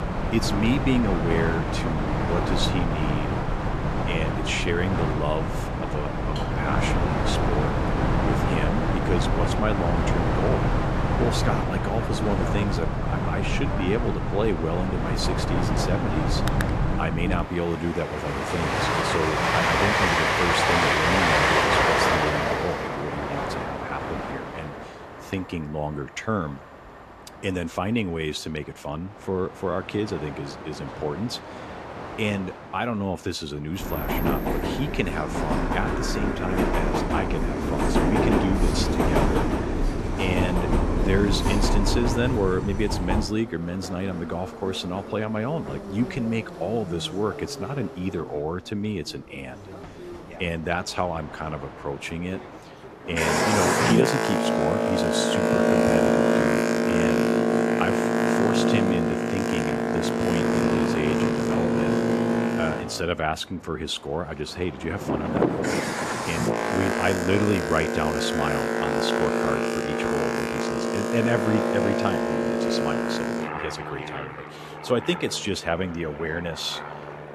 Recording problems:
train or aircraft noise; very loud; throughout; 4 dB above the speech

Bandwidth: 13.5 kHz